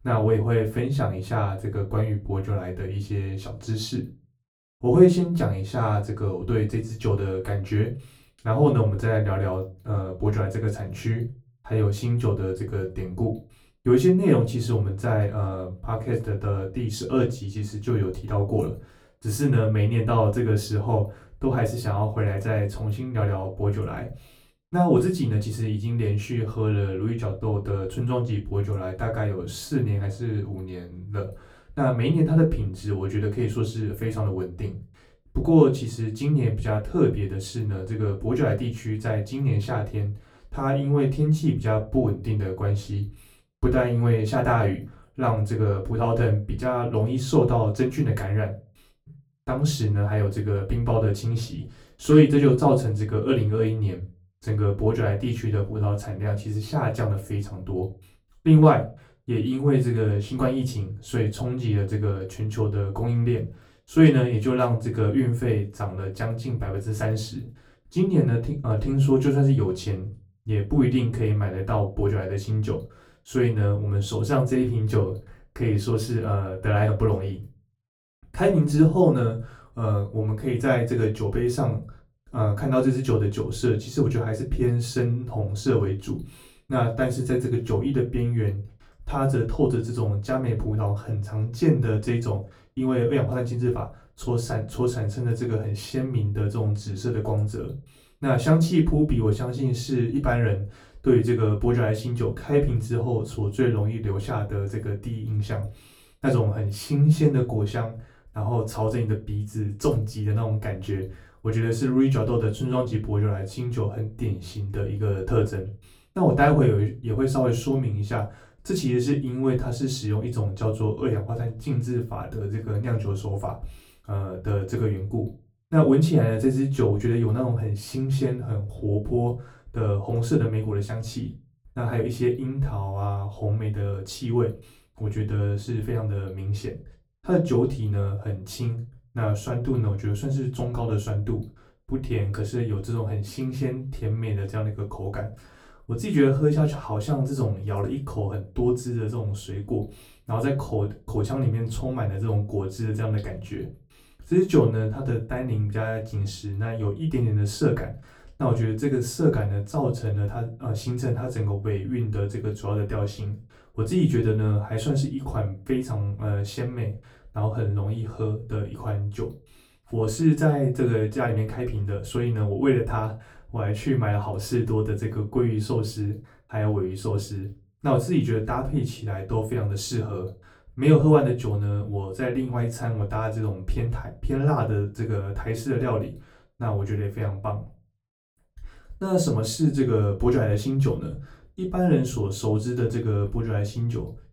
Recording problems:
off-mic speech; far
room echo; very slight; dies away in 0.3 s

